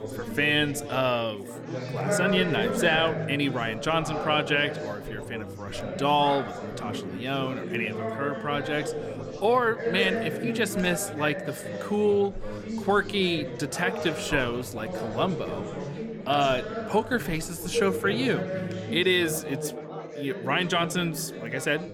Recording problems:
chatter from many people; loud; throughout; 6 dB below the speech

